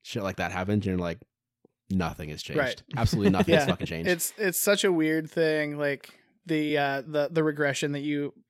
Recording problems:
uneven, jittery; slightly; from 2 to 7.5 s

